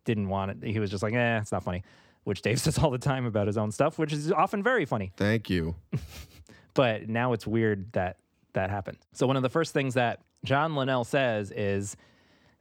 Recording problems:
uneven, jittery; strongly; from 1.5 to 11 s

